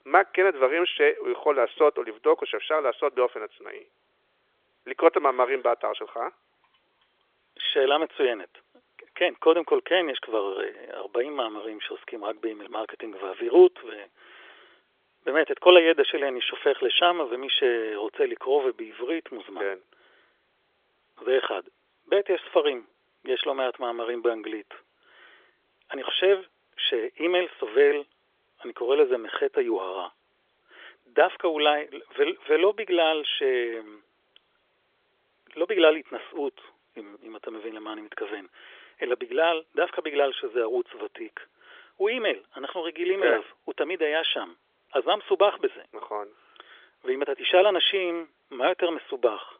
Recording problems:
phone-call audio; nothing above 3.5 kHz

